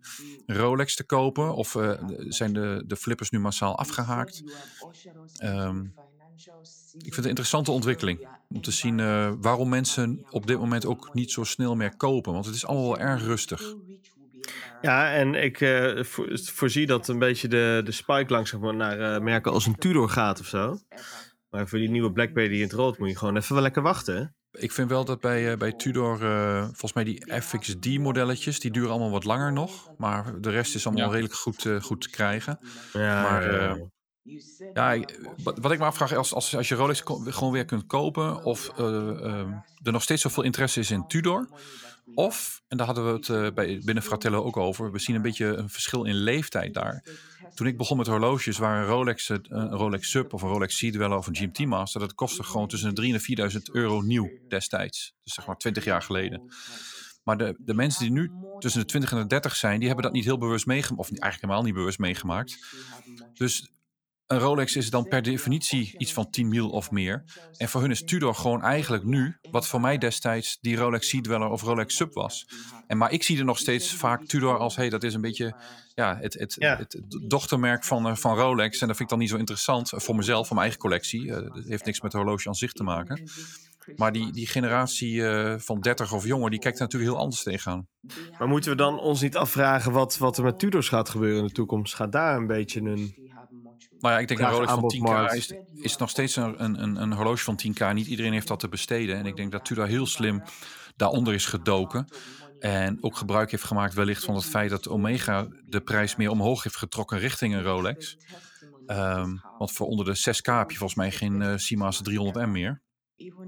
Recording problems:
voice in the background; faint; throughout; 20 dB below the speech

